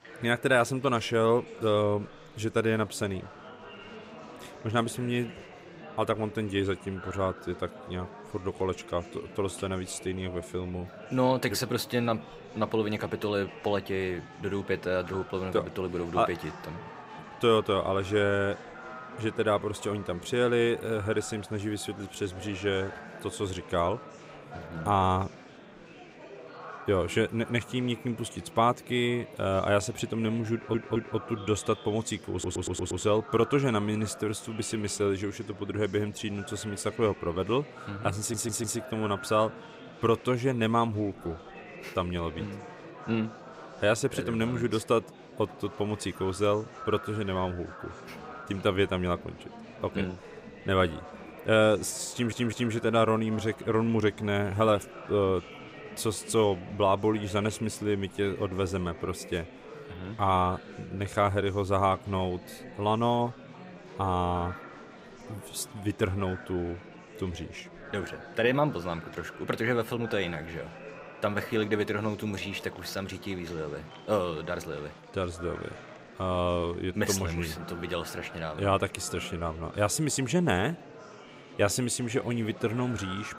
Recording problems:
murmuring crowd; noticeable; throughout; 15 dB below the speech
audio stuttering; 4 times, first at 31 s

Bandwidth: 15.5 kHz